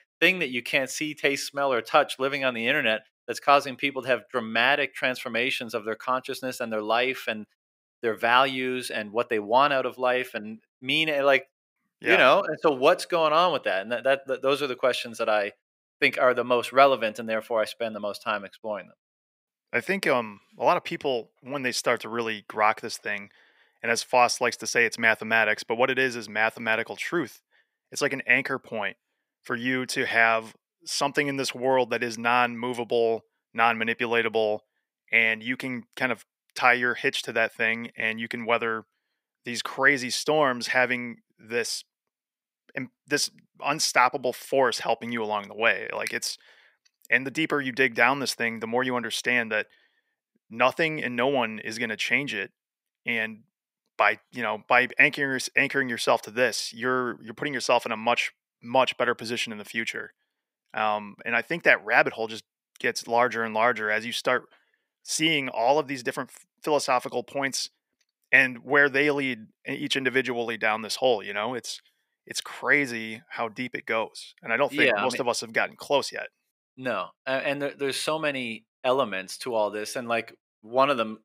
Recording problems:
thin; somewhat; fading below 400 Hz

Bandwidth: 15.5 kHz